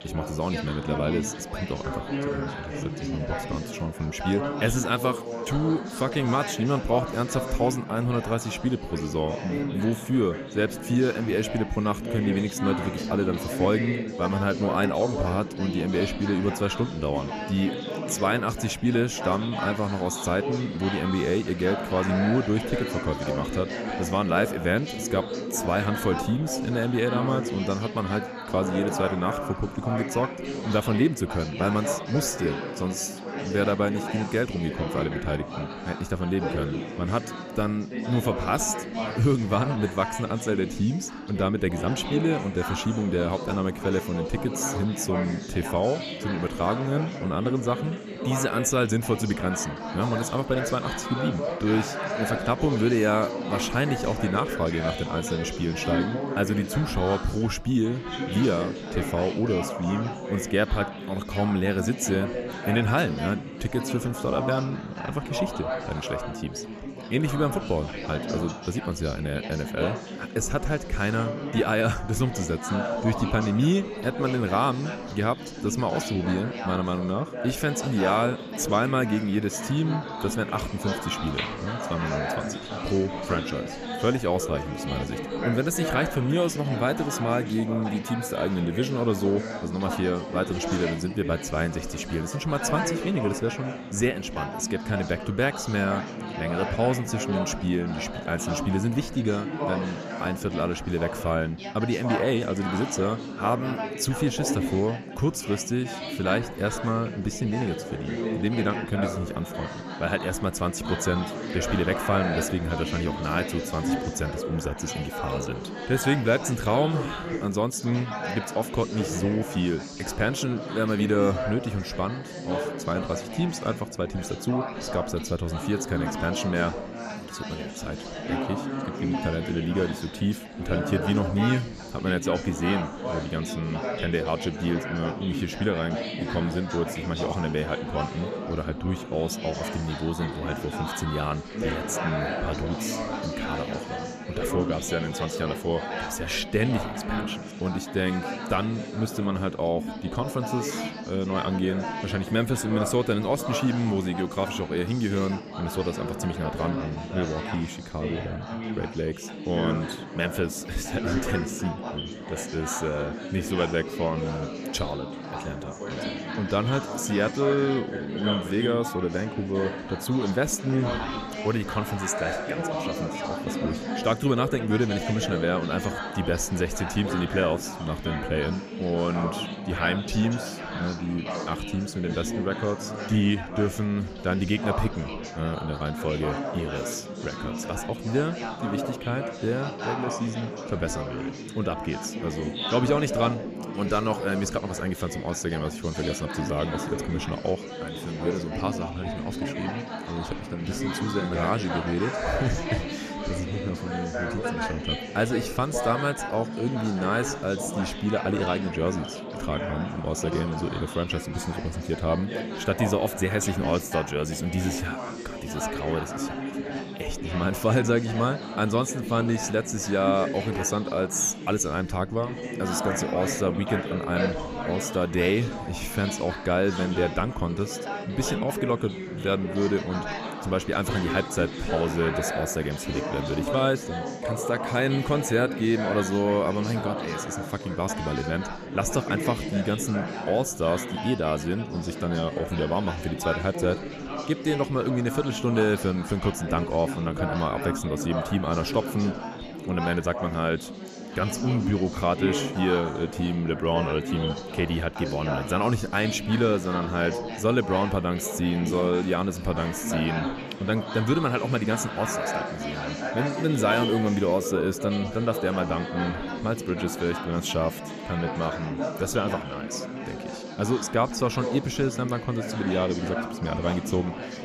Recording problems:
chatter from many people; loud; throughout; 5 dB below the speech

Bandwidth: 14.5 kHz